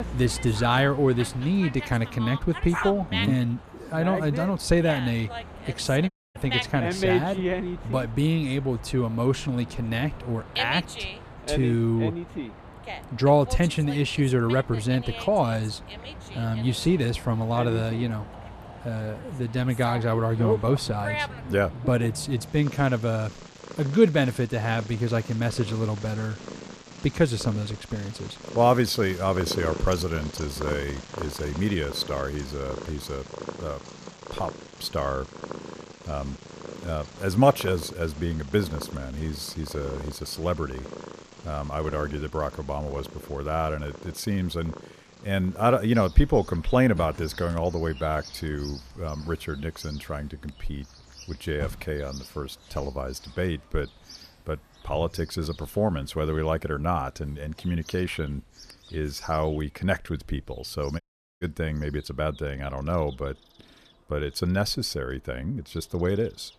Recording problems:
animal sounds; loud; throughout; 10 dB below the speech
audio cutting out; at 6 s and at 1:01

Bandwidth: 14.5 kHz